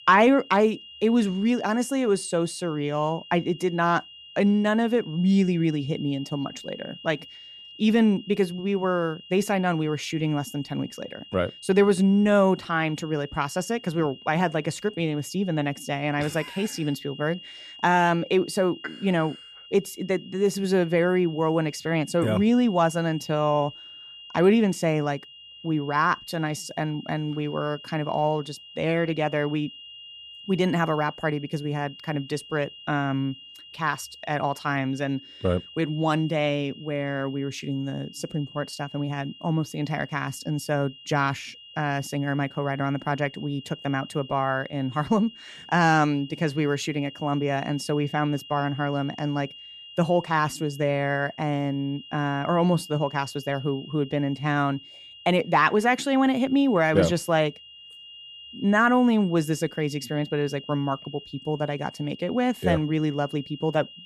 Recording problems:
high-pitched whine; noticeable; throughout; 3 kHz, 20 dB below the speech

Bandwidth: 13.5 kHz